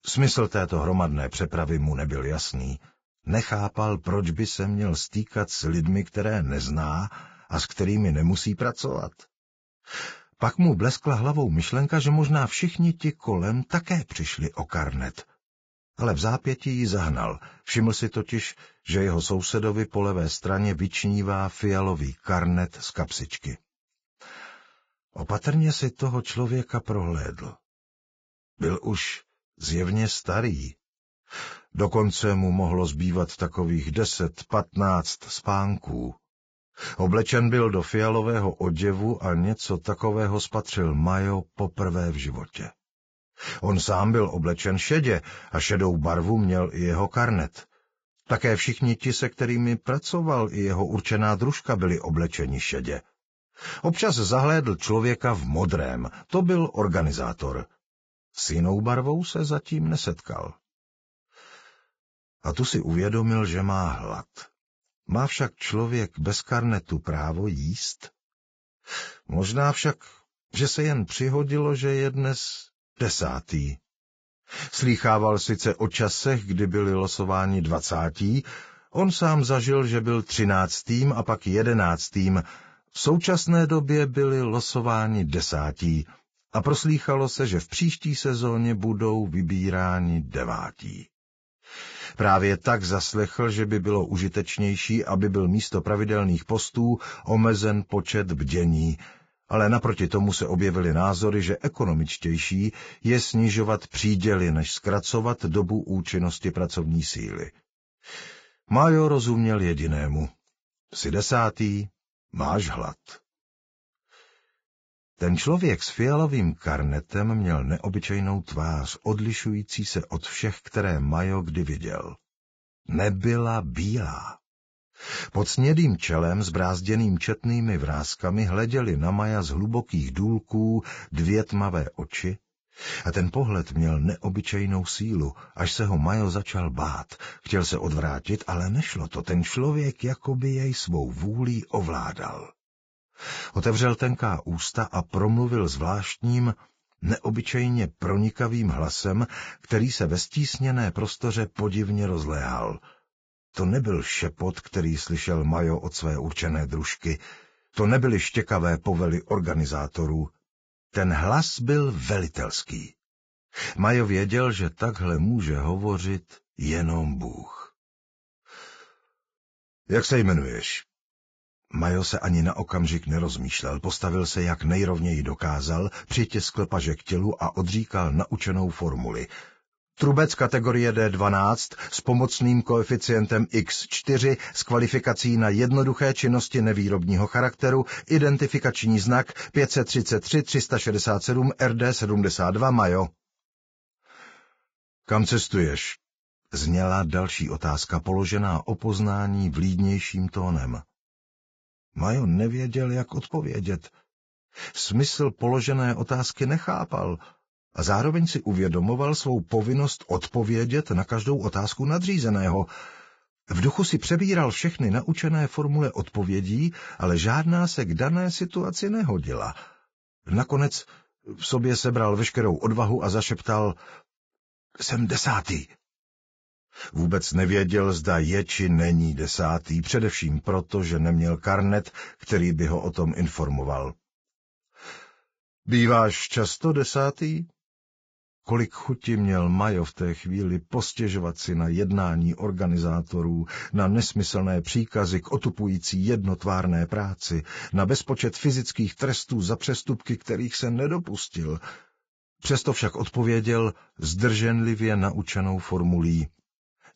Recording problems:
garbled, watery; badly; nothing above 7.5 kHz

